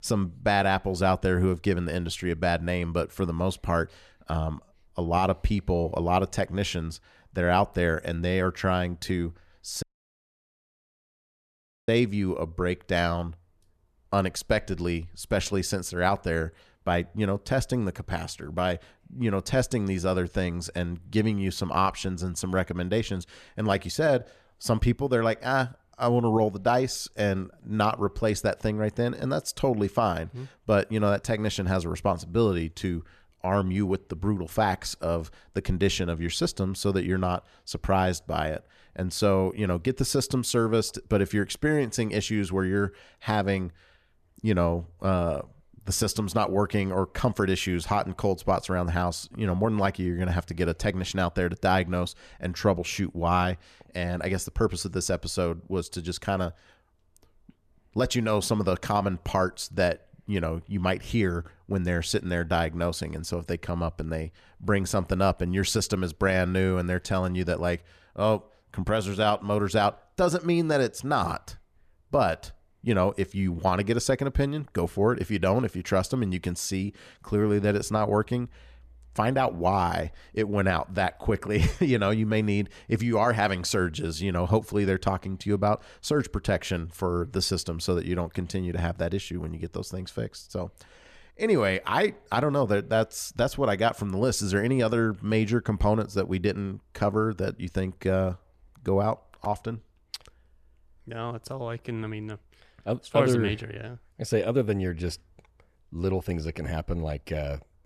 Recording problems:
audio cutting out; at 10 s for 2 s

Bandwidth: 14 kHz